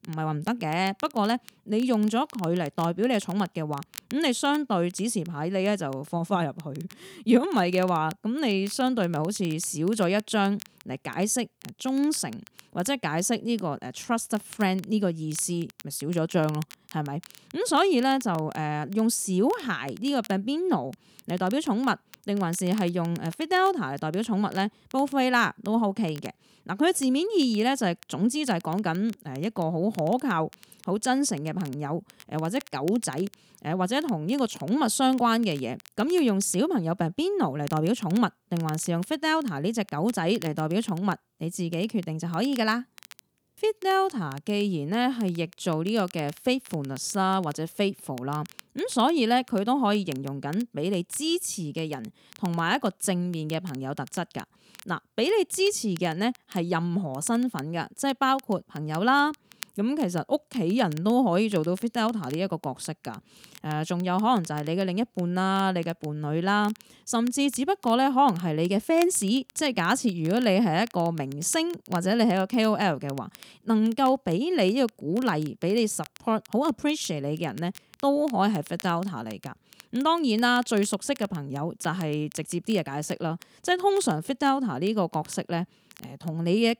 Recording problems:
crackle, like an old record; faint; 25 dB below the speech

